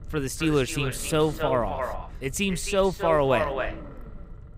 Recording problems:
echo of what is said; strong; throughout; 270 ms later, 8 dB below the speech
low rumble; faint; throughout; 20 dB below the speech

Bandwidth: 15.5 kHz